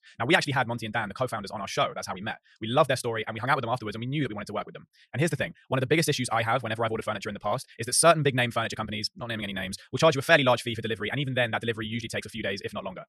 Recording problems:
wrong speed, natural pitch; too fast; 1.6 times normal speed

